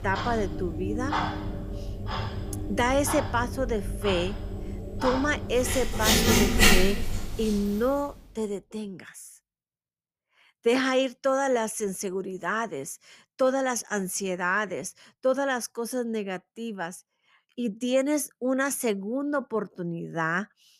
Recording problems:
household noises; very loud; until 8 s; as loud as the speech

